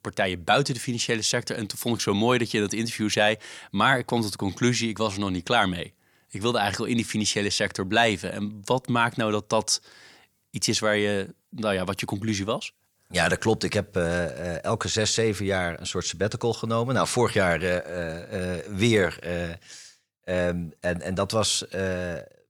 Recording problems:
none

